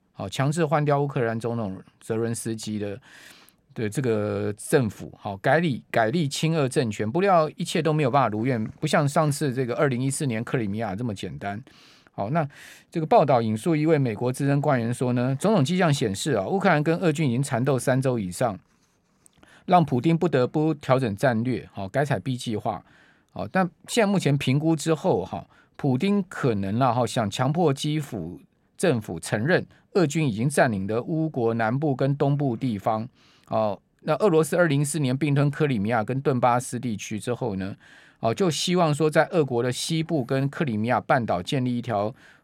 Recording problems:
none

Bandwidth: 16 kHz